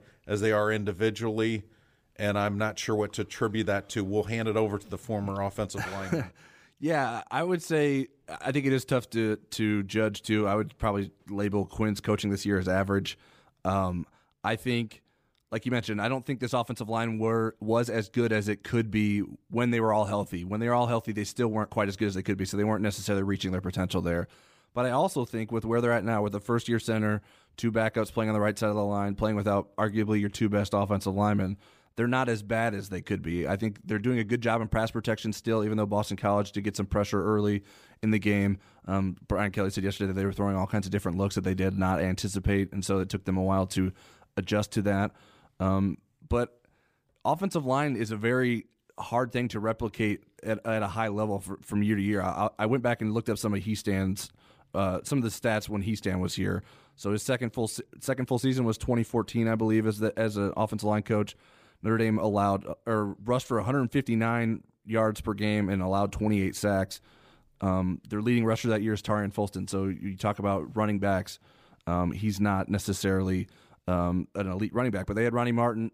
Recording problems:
none

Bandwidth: 15 kHz